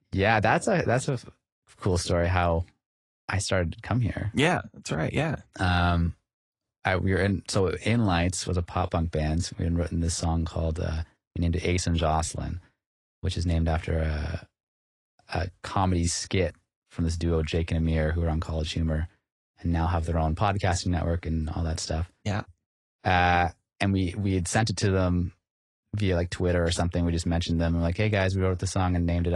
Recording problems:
garbled, watery; slightly
abrupt cut into speech; at the end

